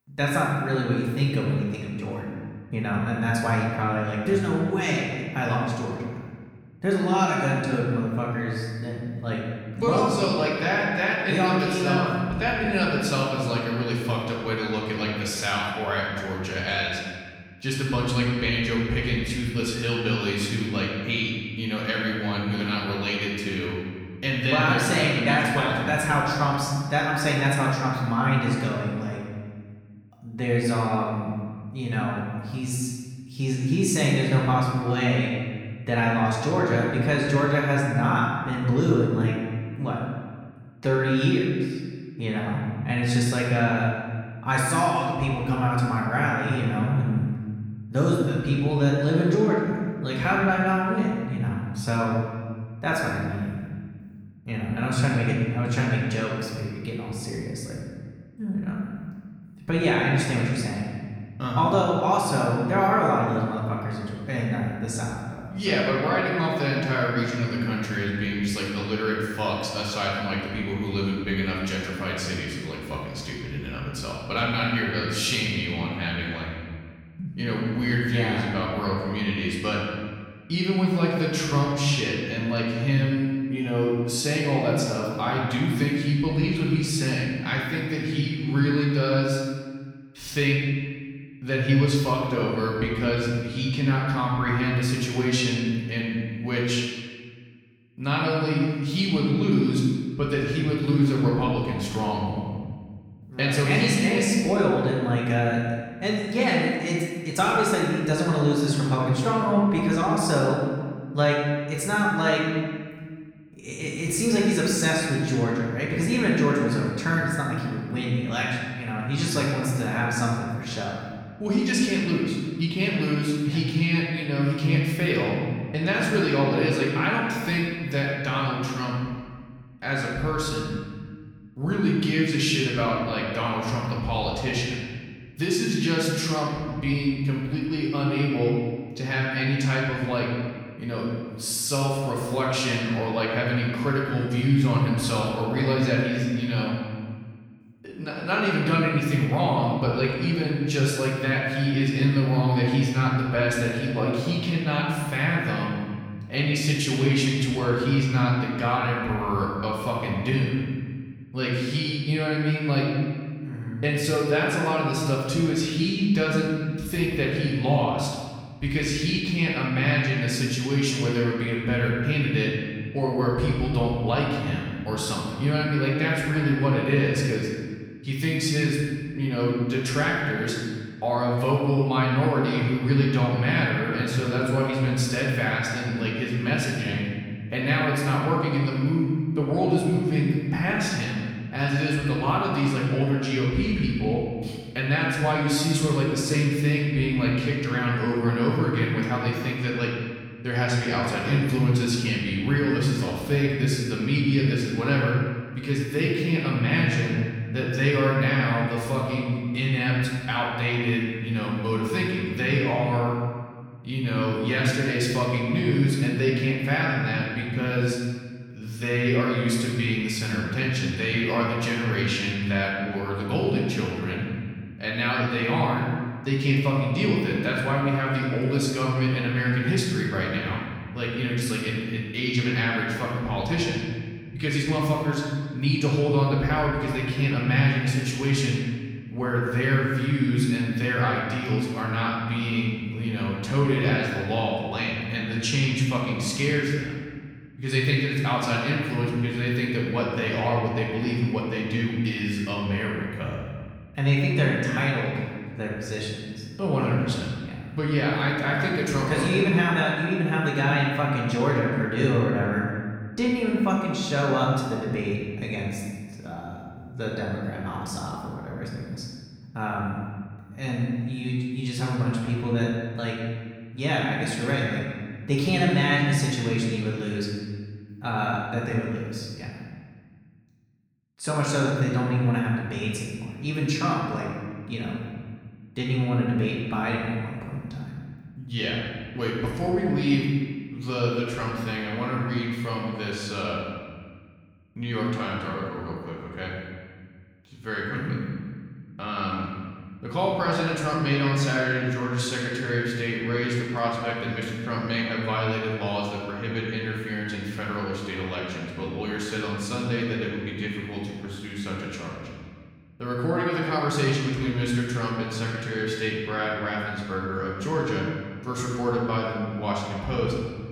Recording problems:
off-mic speech; far
room echo; noticeable; dies away in 1.6 s

